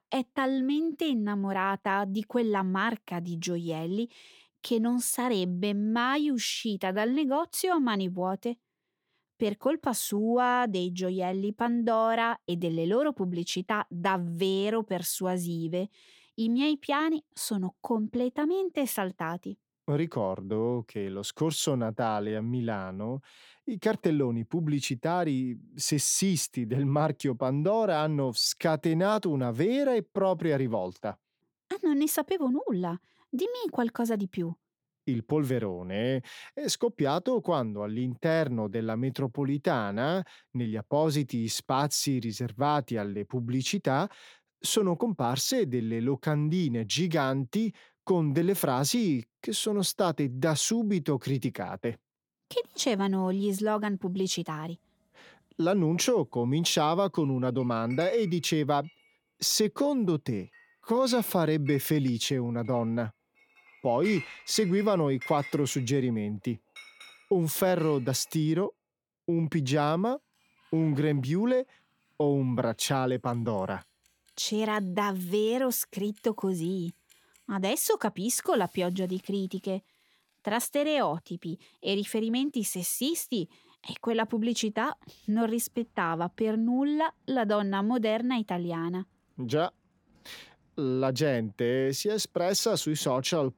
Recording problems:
household noises; faint; from 53 s on; 20 dB below the speech

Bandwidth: 18 kHz